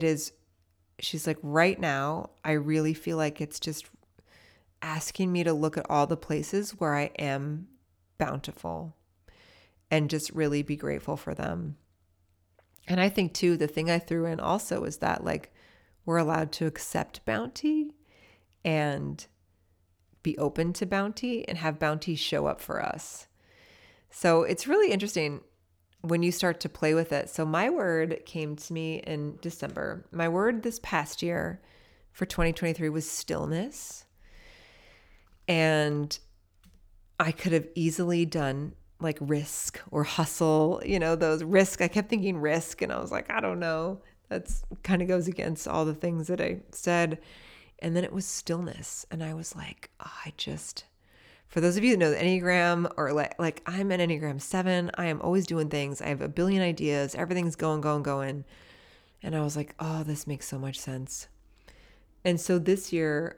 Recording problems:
abrupt cut into speech; at the start

